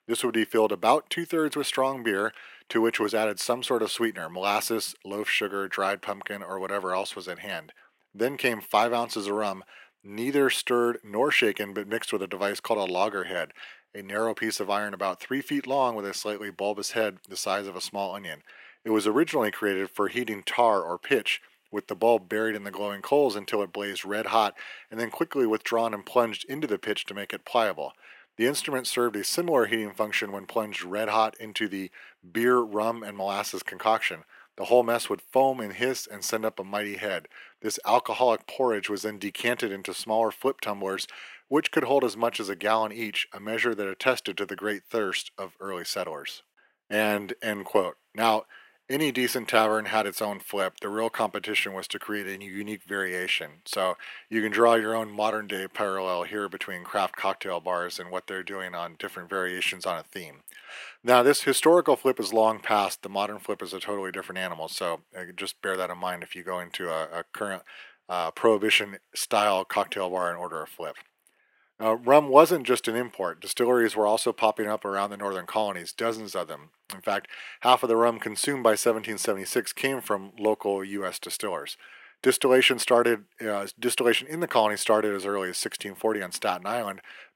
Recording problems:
thin; very; fading below 350 Hz

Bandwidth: 16 kHz